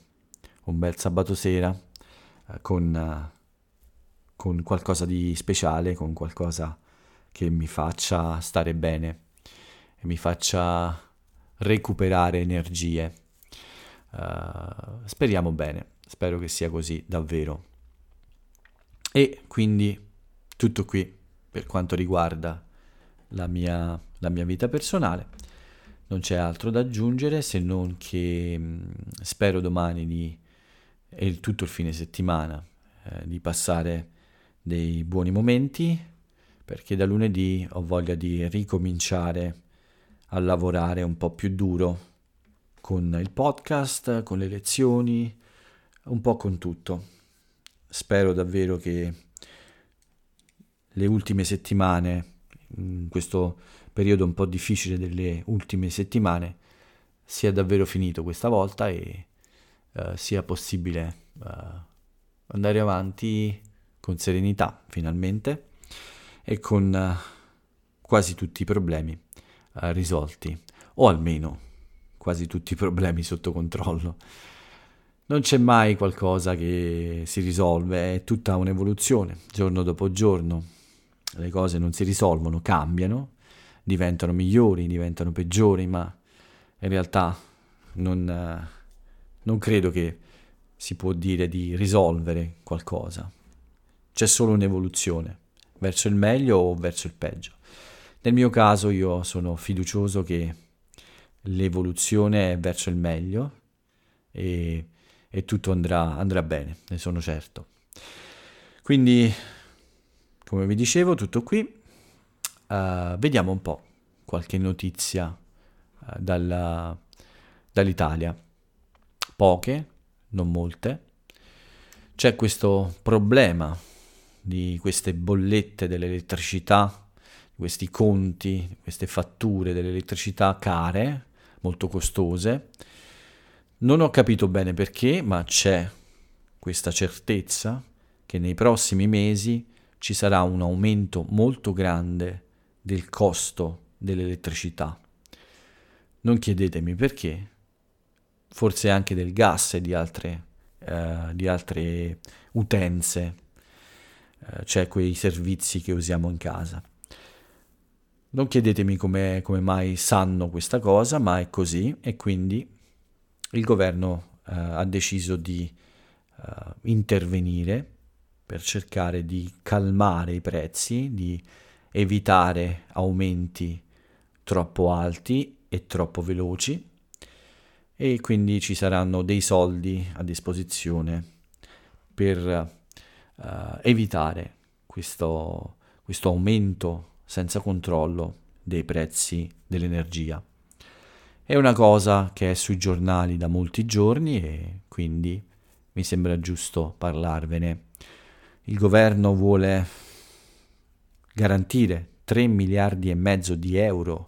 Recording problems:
none

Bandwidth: 17.5 kHz